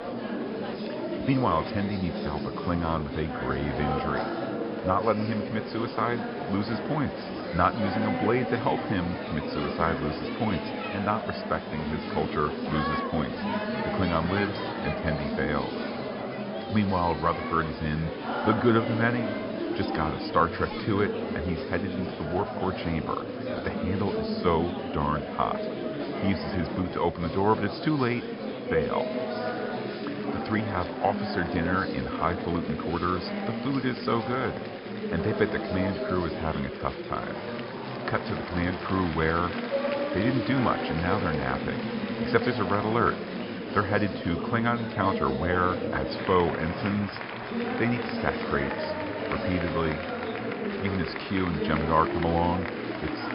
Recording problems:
high frequencies cut off; noticeable; nothing above 5.5 kHz
murmuring crowd; loud; throughout; 3 dB below the speech

